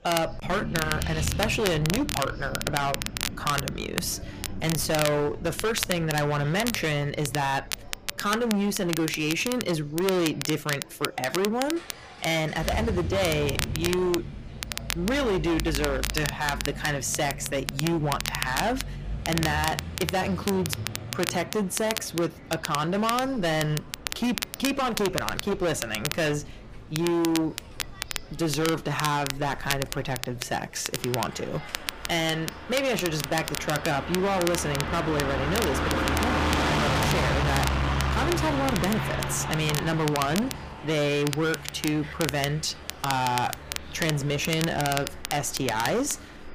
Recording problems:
distortion; heavy; 19% of the sound clipped
traffic noise; loud; throughout; 5 dB below the speech
crackle, like an old record; loud; 7 dB below the speech
murmuring crowd; faint; throughout; 25 dB below the speech

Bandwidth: 15 kHz